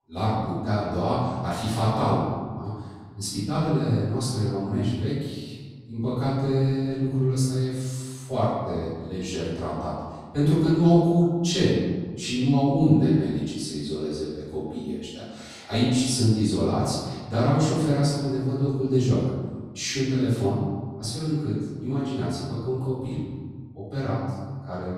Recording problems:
room echo; strong; dies away in 1.5 s
off-mic speech; far

